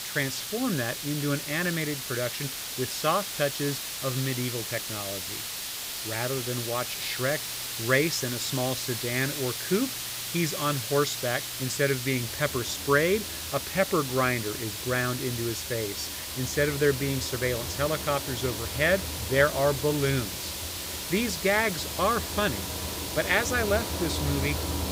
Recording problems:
hiss; loud; throughout; 4 dB below the speech
machinery noise; noticeable; throughout; 10 dB below the speech

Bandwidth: 15.5 kHz